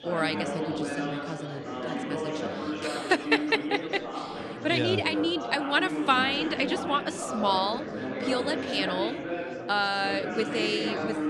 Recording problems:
chatter from many people; loud; throughout; 5 dB below the speech

